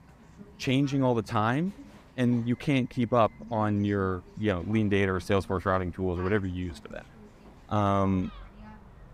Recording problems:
animal sounds; faint; throughout; 25 dB below the speech
voice in the background; faint; throughout; 25 dB below the speech

